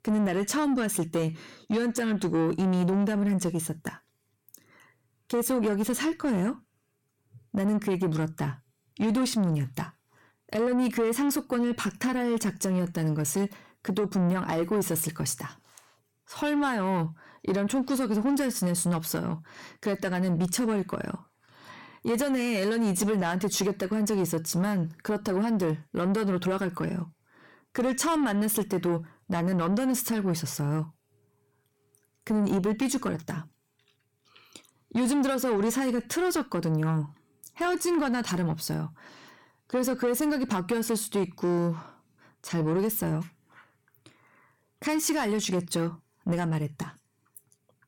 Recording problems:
distortion; slight; 10 dB below the speech

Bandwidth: 17 kHz